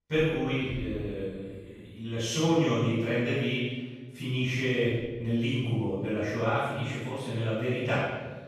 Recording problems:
room echo; strong; dies away in 1.3 s
off-mic speech; far

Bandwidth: 13.5 kHz